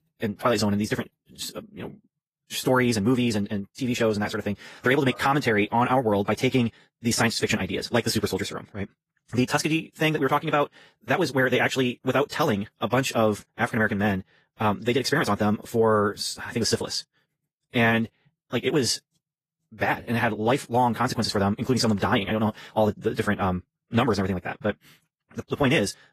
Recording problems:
wrong speed, natural pitch; too fast; 1.7 times normal speed
garbled, watery; slightly; nothing above 14.5 kHz

